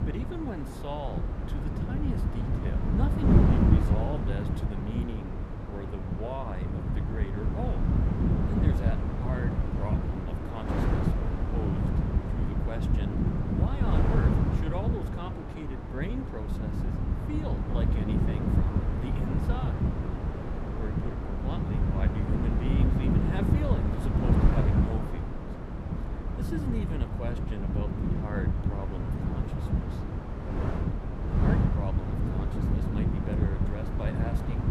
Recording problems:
wind noise on the microphone; heavy; 3 dB above the speech

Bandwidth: 15 kHz